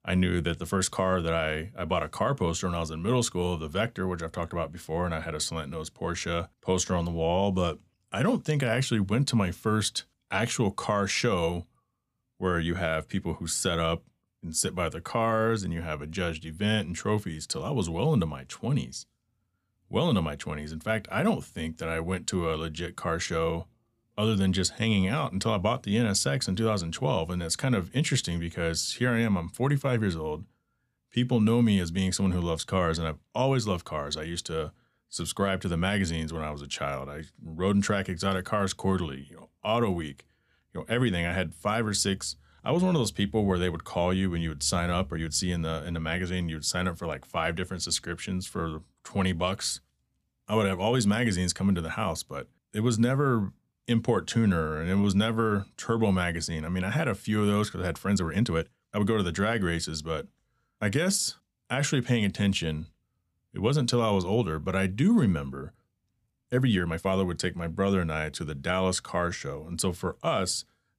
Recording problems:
uneven, jittery; strongly; from 45 s to 1:07

